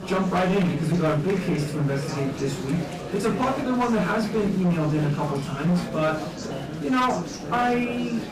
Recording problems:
off-mic speech; far
room echo; slight; dies away in 0.3 s
distortion; slight; 12% of the sound clipped
chatter from many people; loud; throughout; 8 dB below the speech
background music; faint; throughout; 25 dB below the speech

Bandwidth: 15 kHz